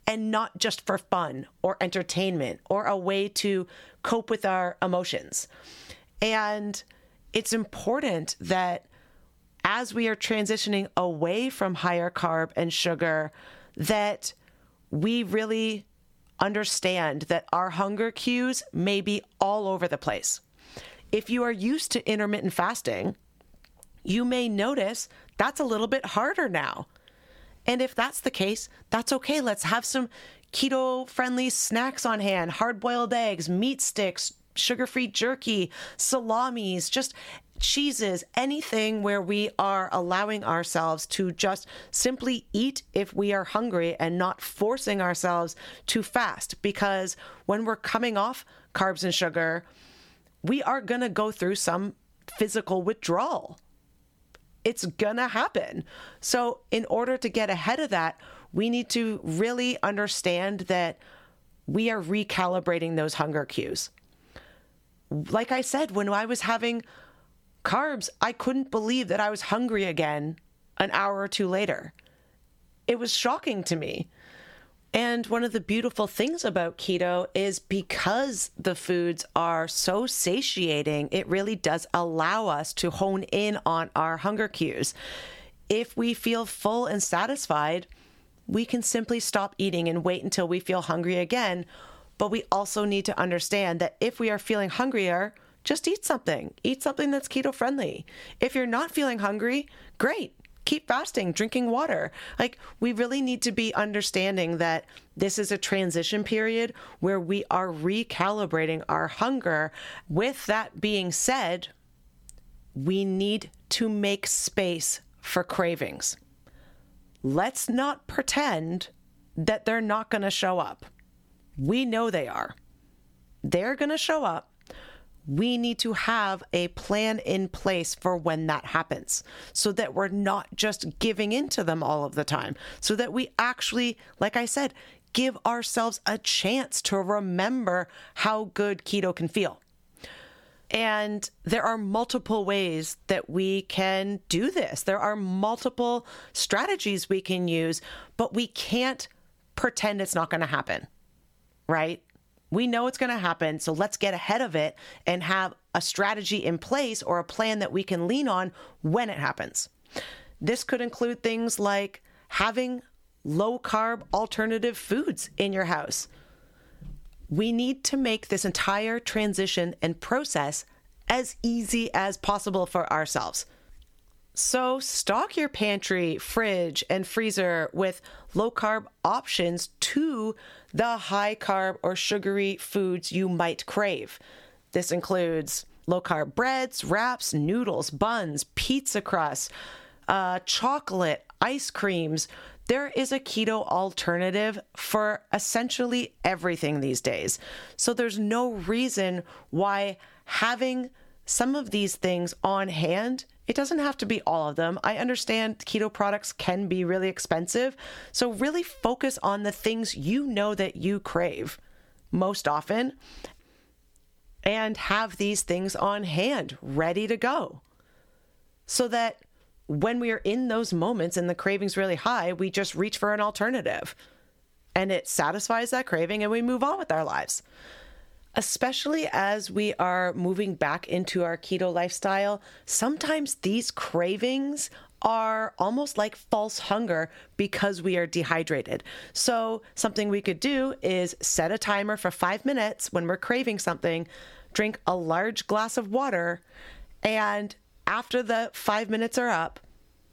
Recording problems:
squashed, flat; somewhat

